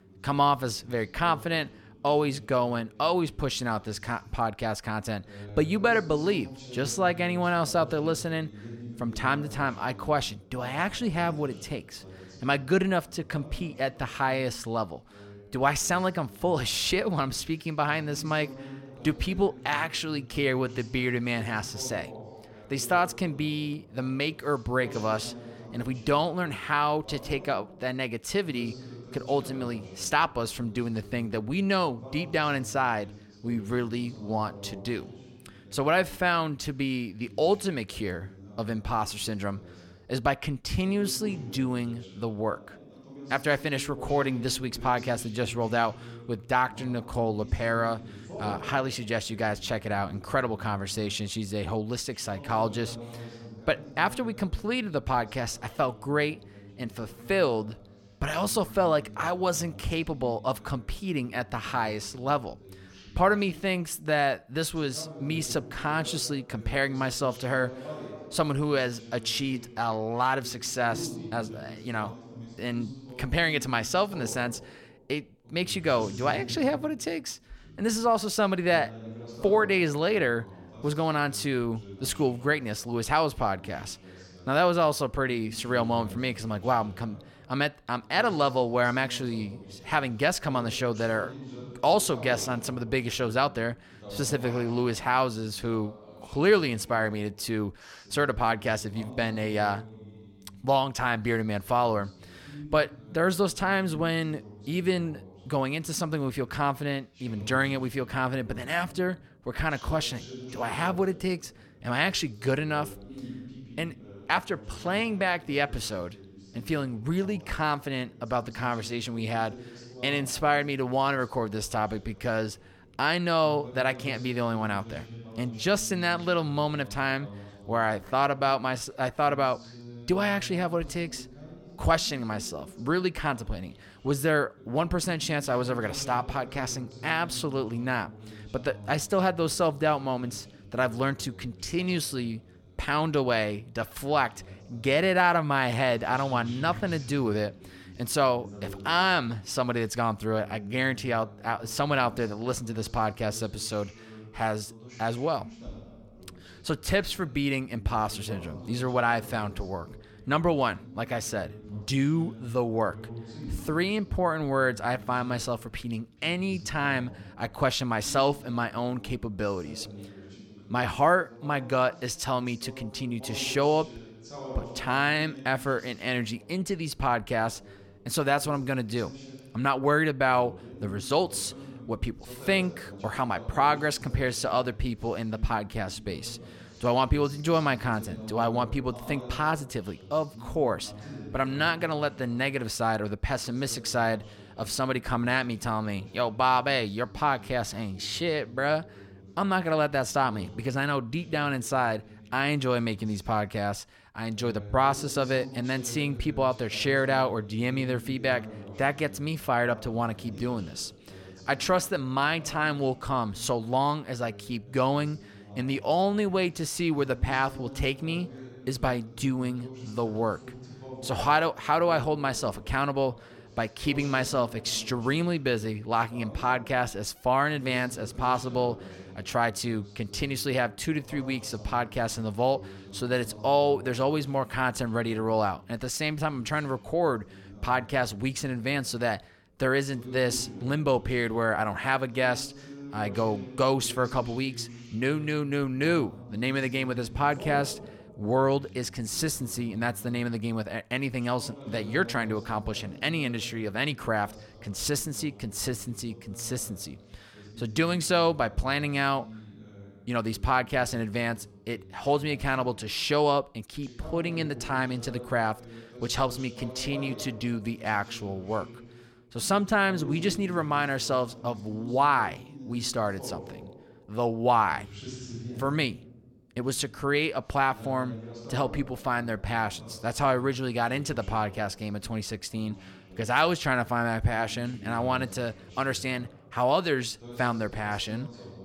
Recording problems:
voice in the background; noticeable; throughout; 15 dB below the speech

